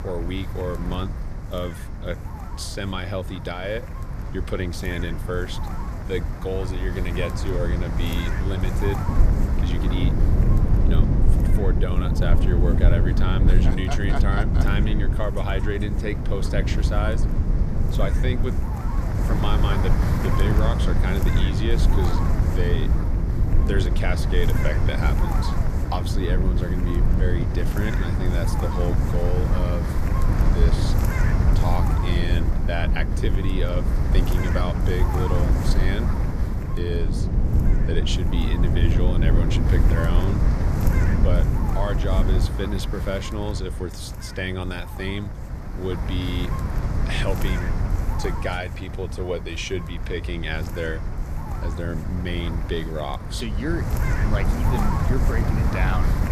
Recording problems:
wind noise on the microphone; heavy; 4 dB below the speech
low rumble; loud; from 9 to 42 s; 5 dB below the speech

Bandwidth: 14.5 kHz